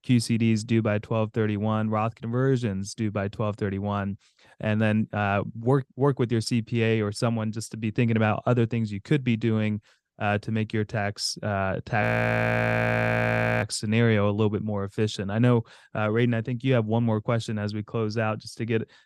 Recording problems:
audio freezing; at 12 s for 1.5 s

